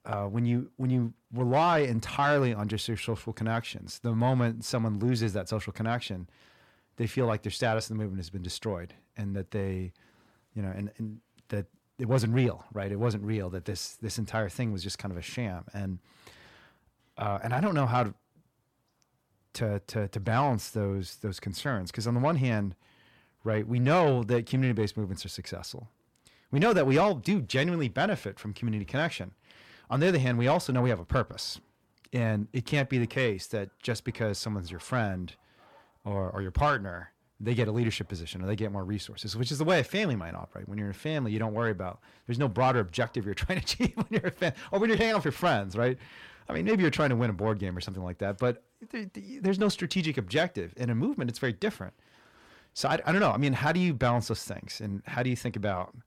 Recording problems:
distortion; slight; 10 dB below the speech

